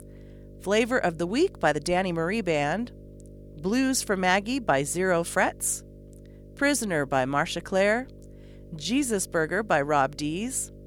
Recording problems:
electrical hum; faint; throughout; 50 Hz, 25 dB below the speech

